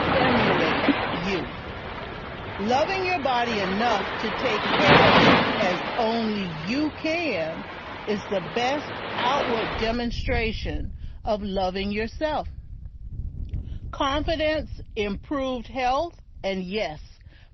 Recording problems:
garbled, watery; slightly; nothing above 6 kHz
rain or running water; very loud; throughout; 2 dB above the speech

